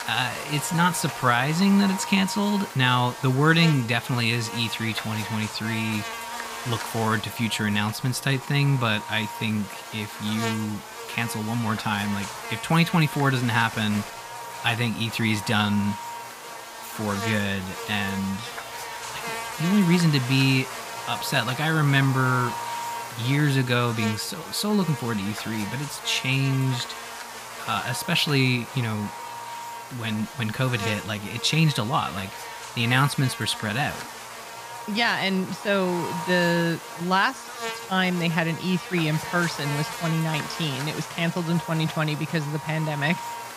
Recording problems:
electrical hum; loud; throughout; 60 Hz, 7 dB below the speech

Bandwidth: 15 kHz